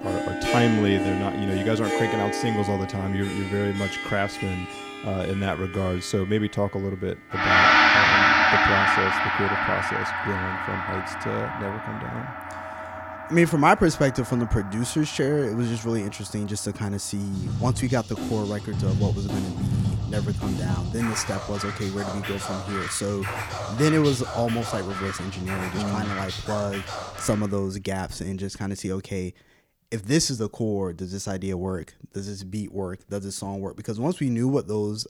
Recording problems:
background music; very loud; until 27 s; 2 dB above the speech

